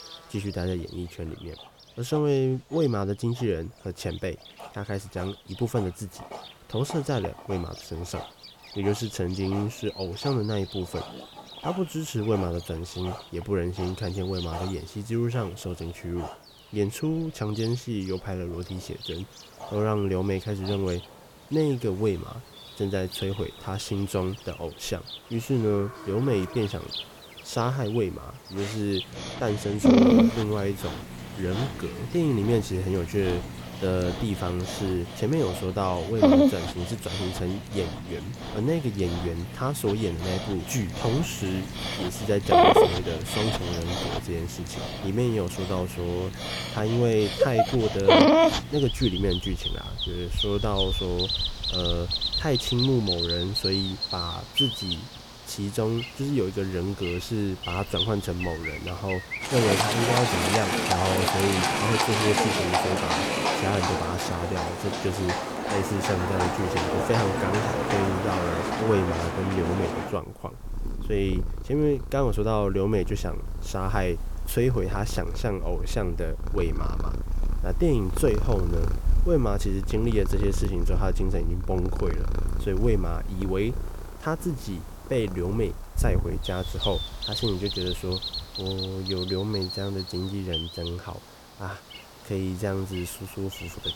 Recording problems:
animal sounds; very loud; throughout; 1 dB above the speech
hiss; faint; from 30 s on; 20 dB below the speech

